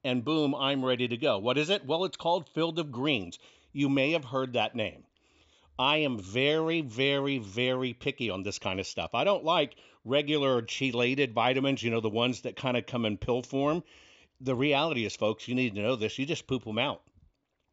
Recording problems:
high frequencies cut off; noticeable; nothing above 8 kHz

